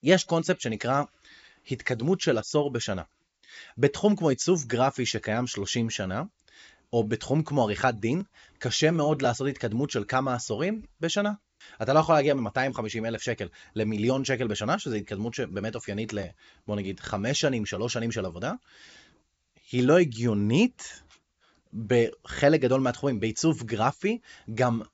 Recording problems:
high frequencies cut off; noticeable; nothing above 7.5 kHz

